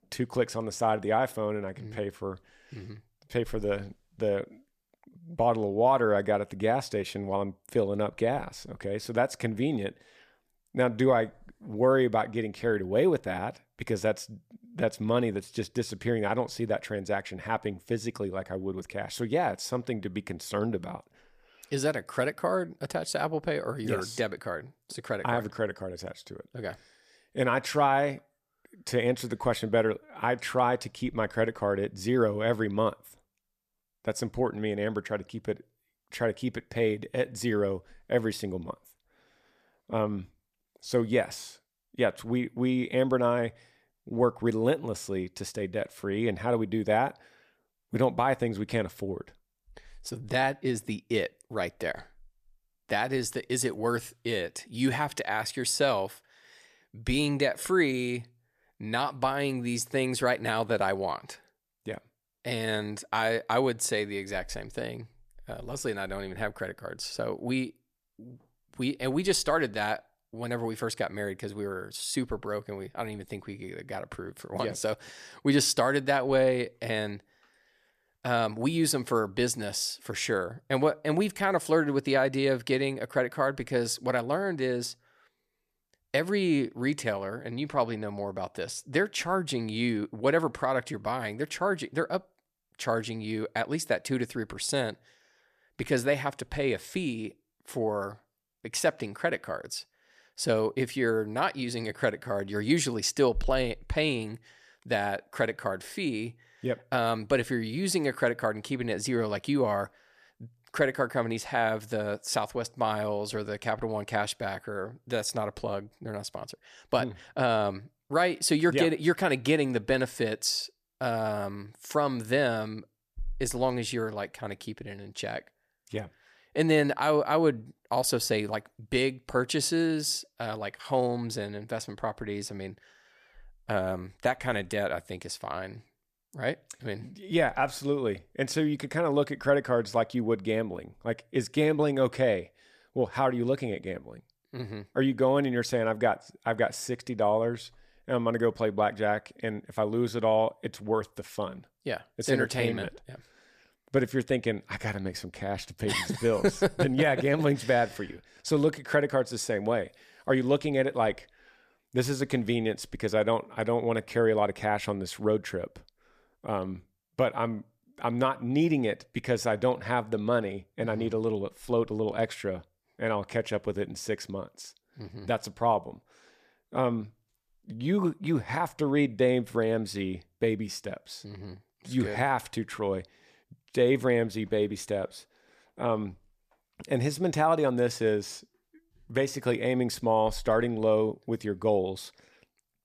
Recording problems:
none

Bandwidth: 14.5 kHz